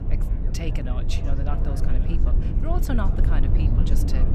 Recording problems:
low rumble; loud; throughout; 2 dB below the speech
chatter from many people; noticeable; throughout; 10 dB below the speech

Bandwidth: 14.5 kHz